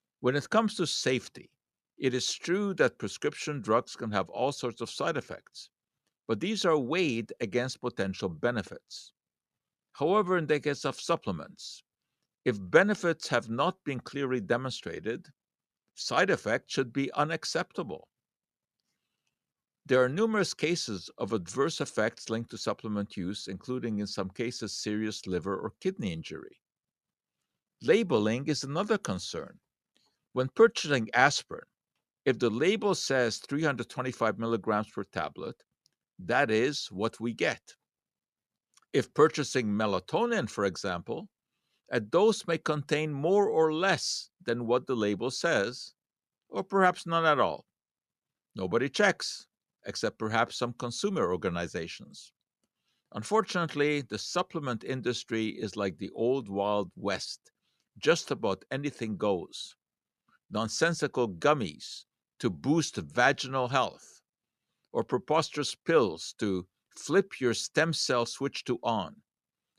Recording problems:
none

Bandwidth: 13.5 kHz